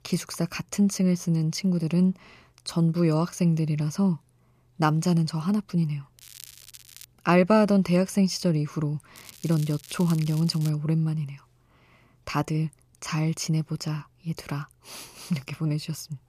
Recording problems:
crackling; noticeable; at 6 s and from 9 to 11 s; 20 dB below the speech

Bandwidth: 14.5 kHz